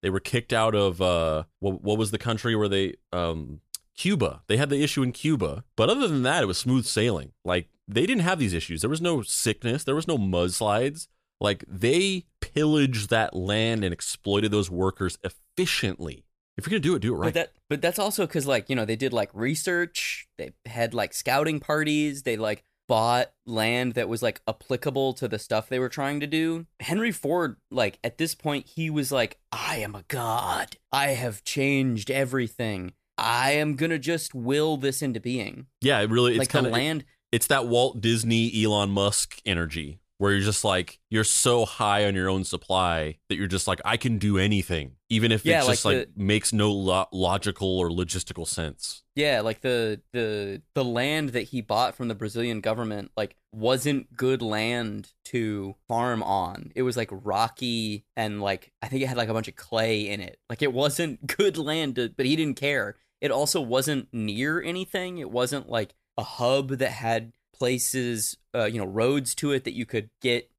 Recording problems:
none

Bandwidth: 14.5 kHz